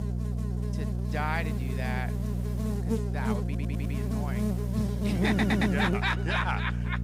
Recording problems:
electrical hum; loud; throughout; 60 Hz, 7 dB below the speech
hiss; faint; from 1 to 2.5 s and from 3.5 to 5.5 s; 20 dB below the speech
audio stuttering; at 3.5 s and at 5.5 s

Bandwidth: 15.5 kHz